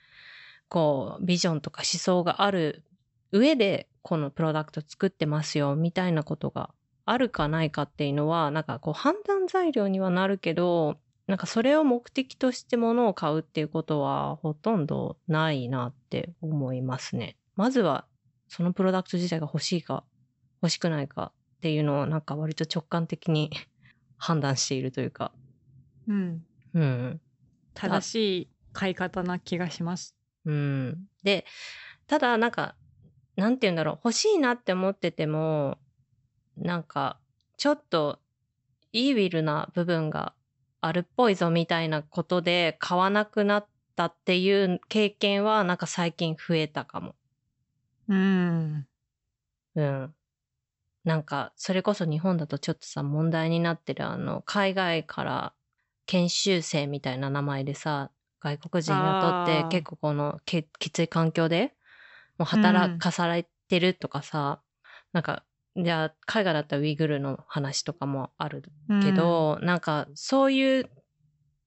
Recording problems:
high frequencies cut off; noticeable; nothing above 8 kHz

